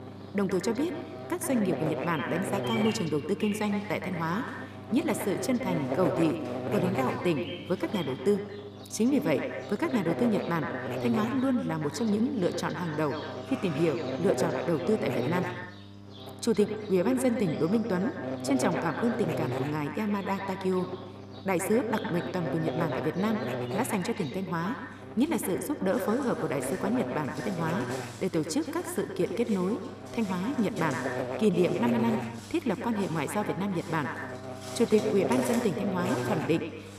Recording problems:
echo of what is said; strong; throughout; 120 ms later, 8 dB below the speech
electrical hum; loud; throughout; 50 Hz, 5 dB below the speech
animal sounds; noticeable; throughout; 20 dB below the speech

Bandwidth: 14.5 kHz